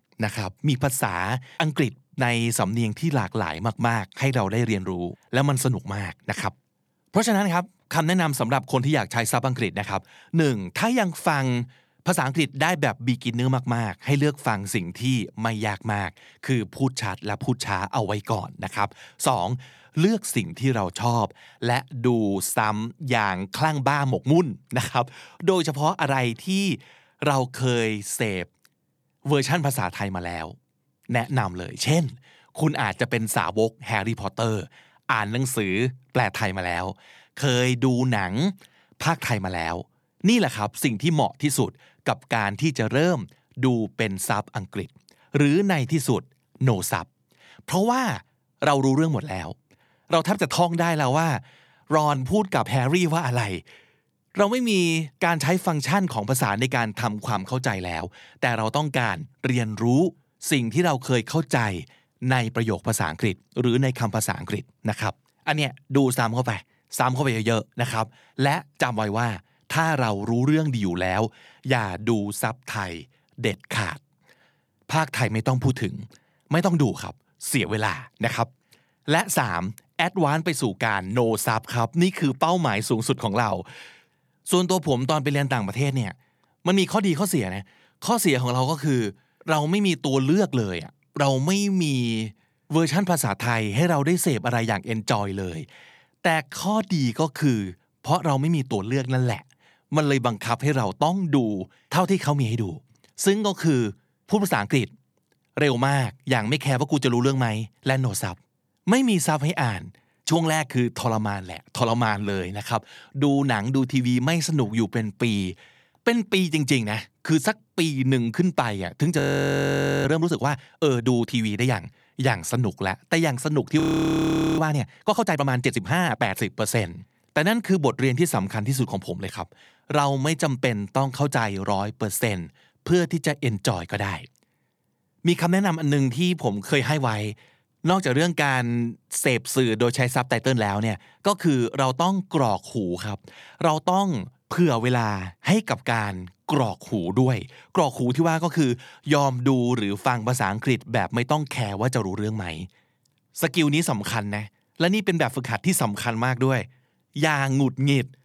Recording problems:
audio freezing; at 1:59 for 1 s and at 2:04 for 1 s

